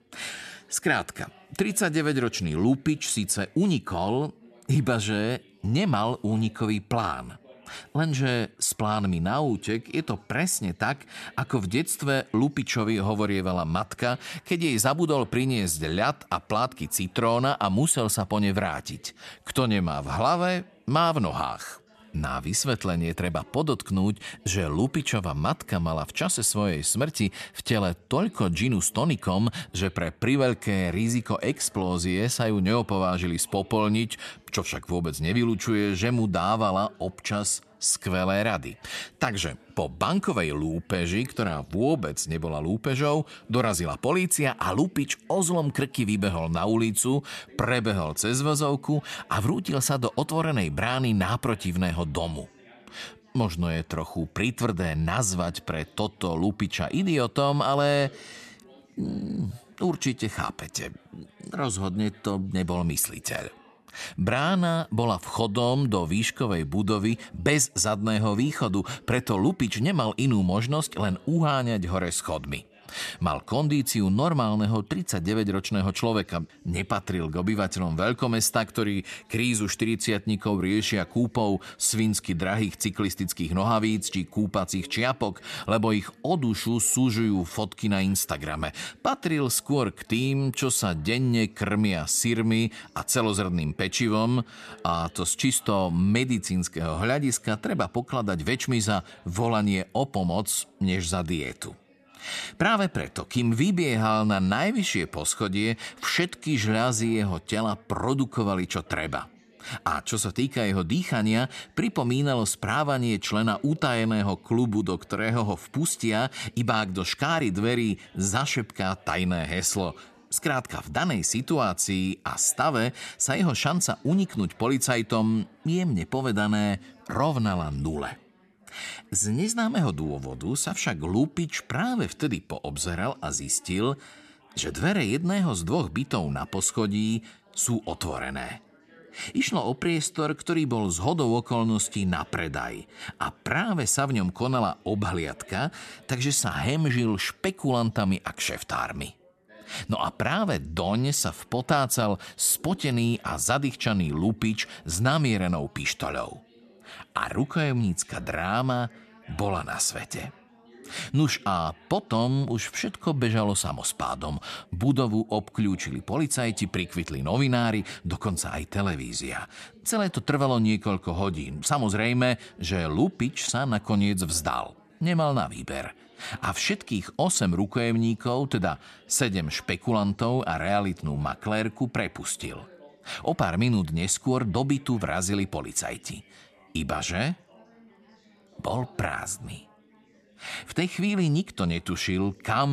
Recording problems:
background chatter; faint; throughout; 4 voices, 30 dB below the speech
abrupt cut into speech; at the end

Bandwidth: 13.5 kHz